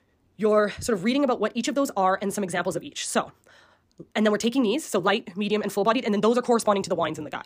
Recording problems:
wrong speed, natural pitch; too fast; 1.6 times normal speed

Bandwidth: 15 kHz